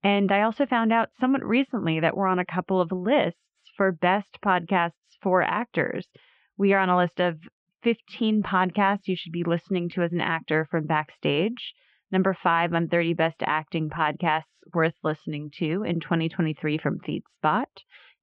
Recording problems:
muffled; very; fading above 3 kHz

